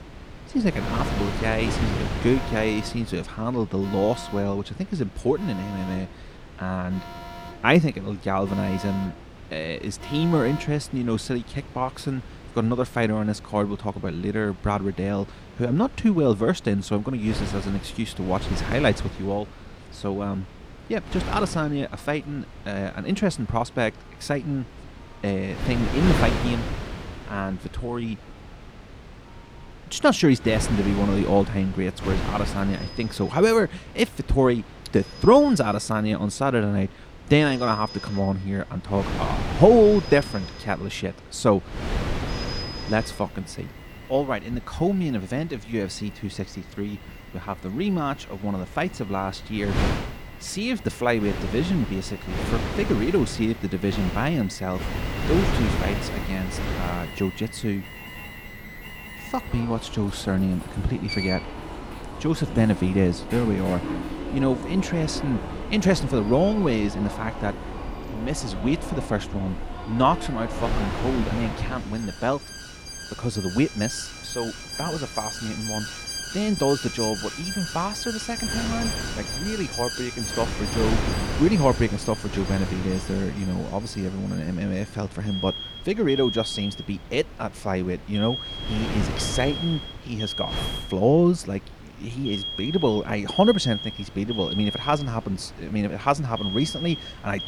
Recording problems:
alarms or sirens; loud; throughout; 9 dB below the speech
wind noise on the microphone; occasional gusts; 10 dB below the speech

